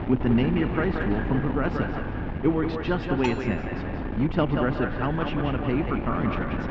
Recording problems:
echo of what is said; strong; throughout; 180 ms later, 6 dB below the speech
muffled; very slightly; fading above 3 kHz
high frequencies cut off; slight; nothing above 8 kHz
wind noise on the microphone; heavy; 6 dB below the speech
dog barking; faint; at 2 s; peak 20 dB below the speech
clattering dishes; noticeable; at 3 s; peak 8 dB below the speech

